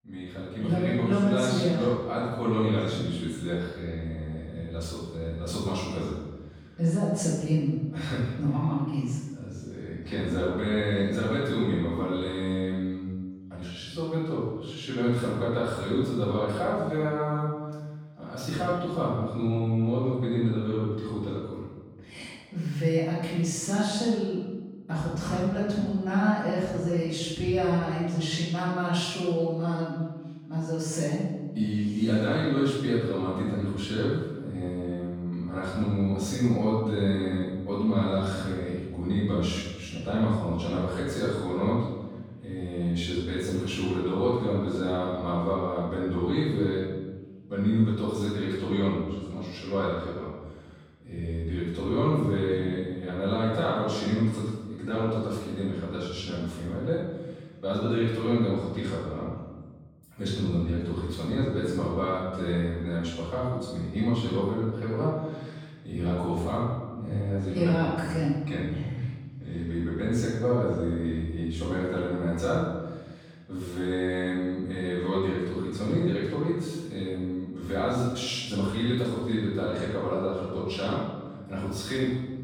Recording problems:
room echo; strong; dies away in 1.2 s
off-mic speech; far

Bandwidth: 17 kHz